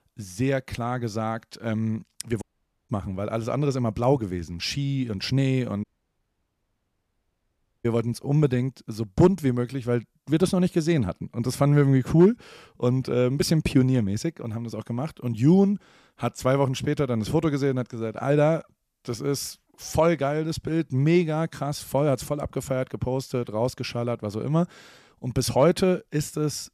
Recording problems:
audio cutting out; at 2.5 s and at 6 s for 2 s

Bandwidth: 14.5 kHz